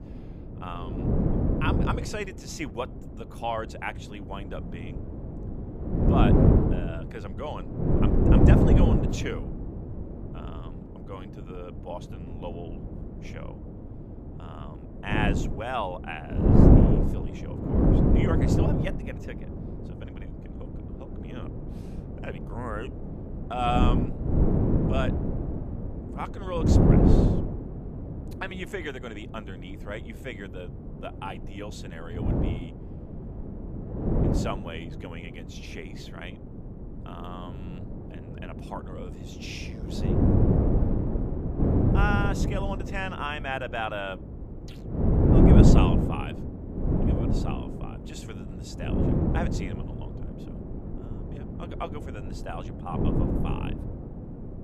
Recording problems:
wind noise on the microphone; heavy; 3 dB above the speech

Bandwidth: 15 kHz